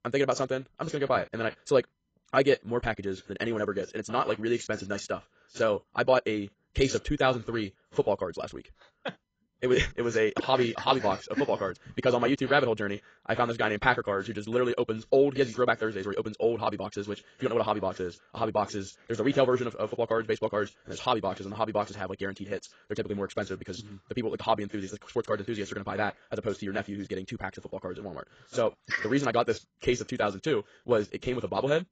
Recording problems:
garbled, watery; badly; nothing above 7.5 kHz
wrong speed, natural pitch; too fast; 1.8 times normal speed

